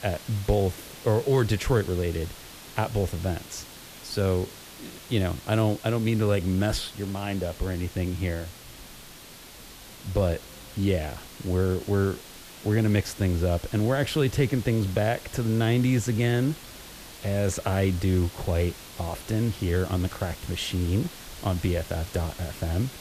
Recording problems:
hiss; noticeable; throughout; 15 dB below the speech

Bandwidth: 14.5 kHz